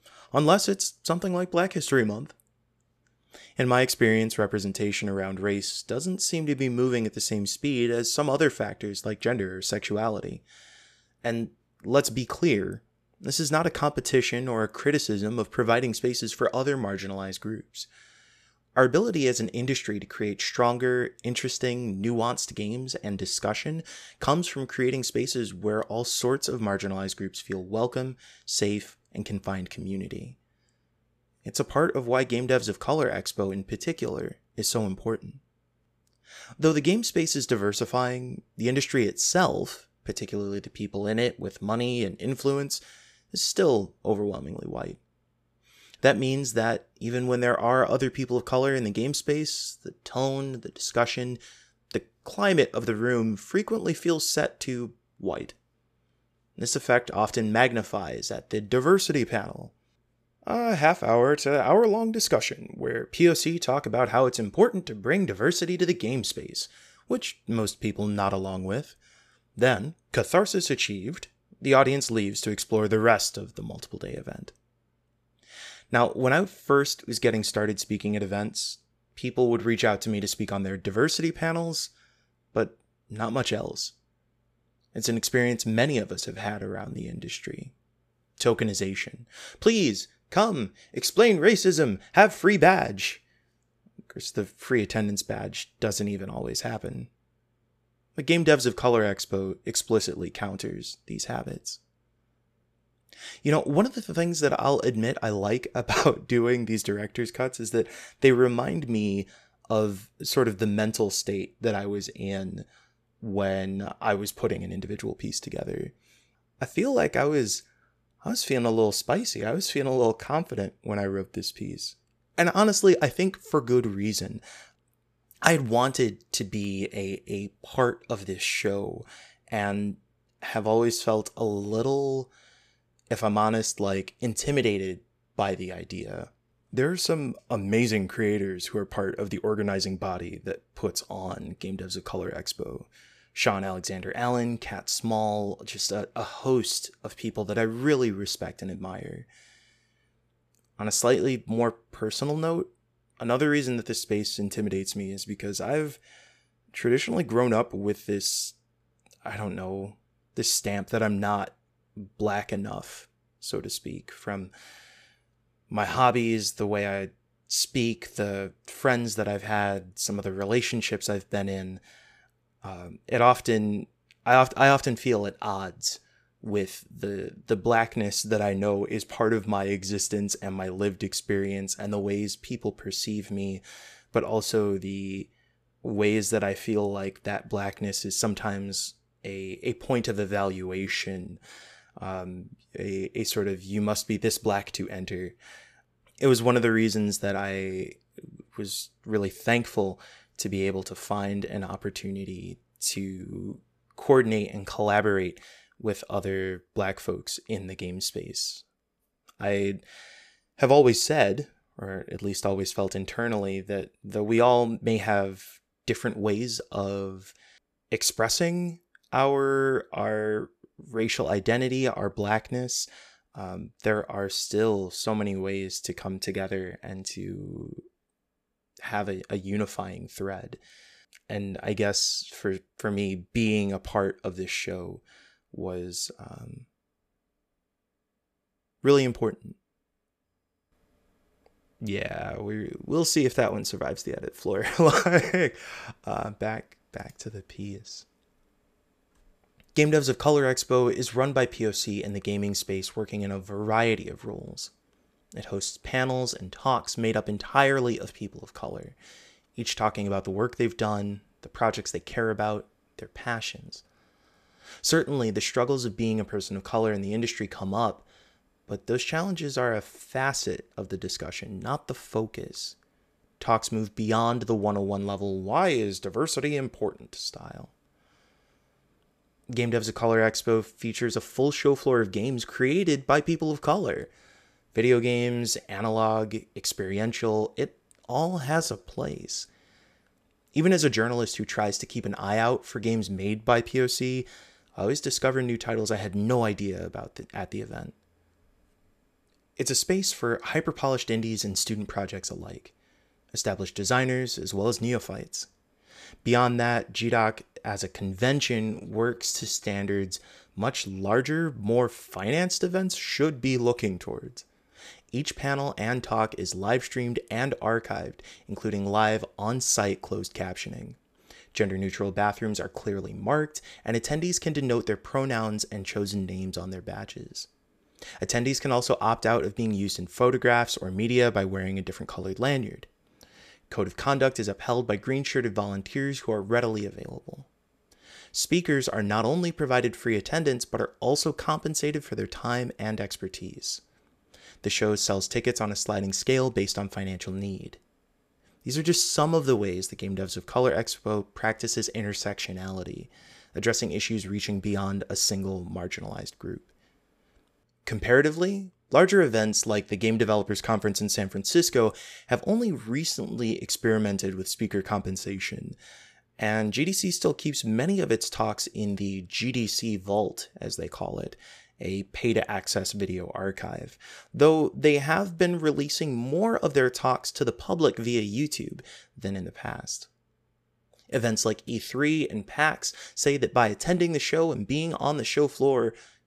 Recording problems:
uneven, jittery; strongly; from 1:26 to 5:10

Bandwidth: 14.5 kHz